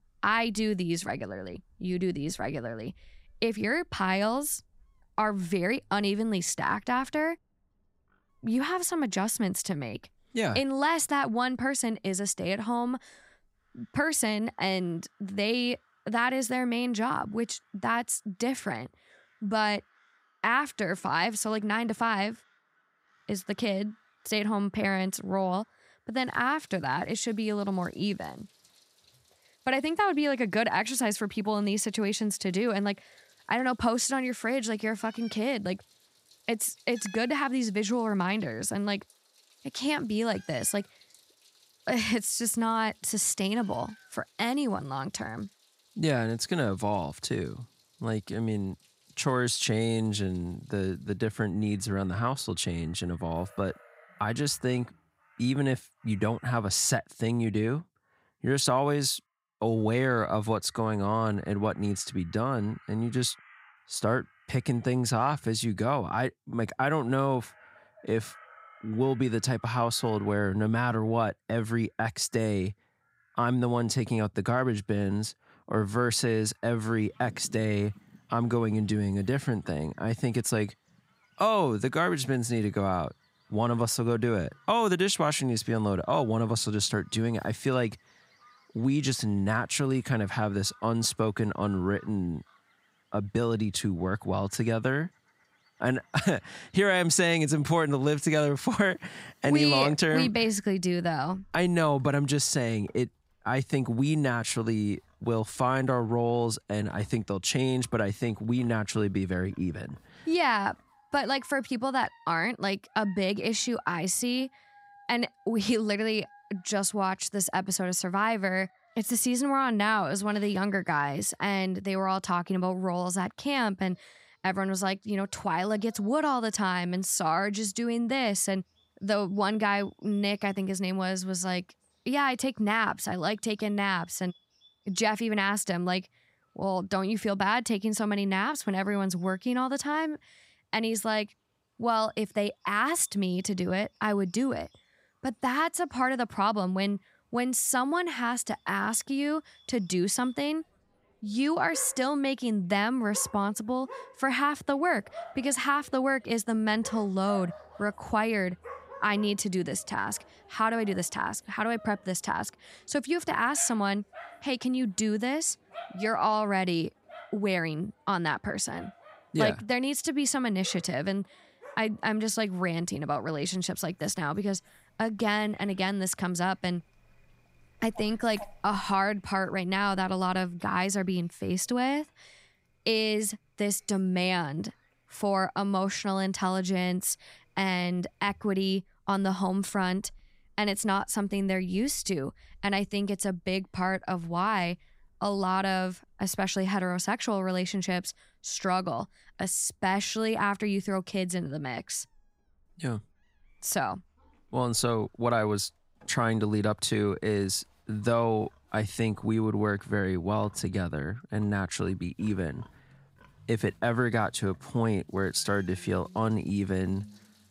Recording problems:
animal sounds; faint; throughout; 25 dB below the speech

